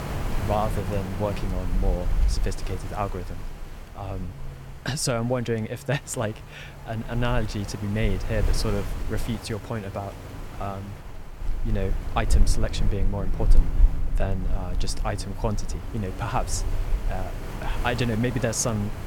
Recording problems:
wind noise on the microphone; heavy; 10 dB below the speech

